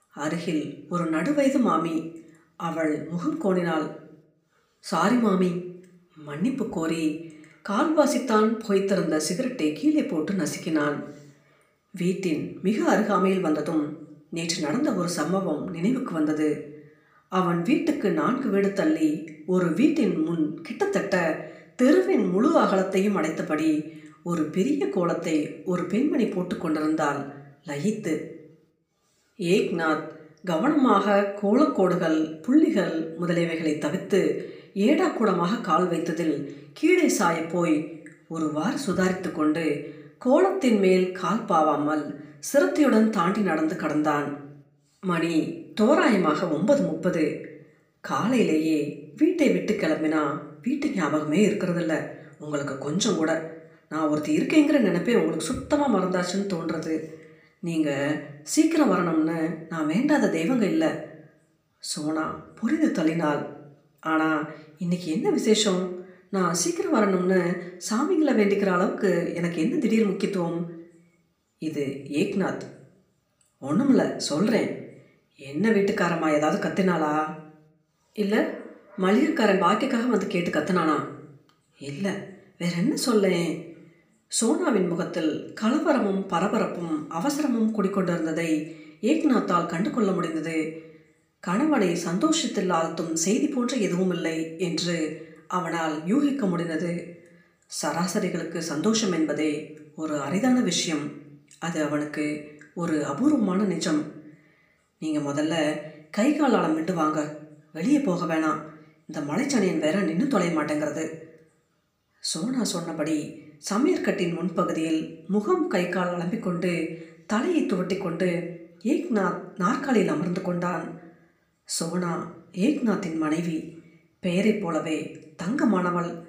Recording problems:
room echo; slight; dies away in 0.5 s
off-mic speech; somewhat distant

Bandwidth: 15 kHz